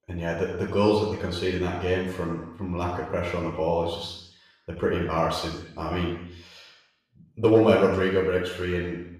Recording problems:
off-mic speech; far
room echo; noticeable; dies away in 0.8 s

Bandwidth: 14.5 kHz